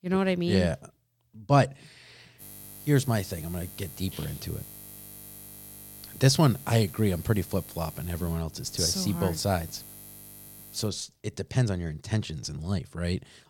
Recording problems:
electrical hum; noticeable; from 2.5 to 11 s; 50 Hz, 20 dB below the speech

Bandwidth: 17.5 kHz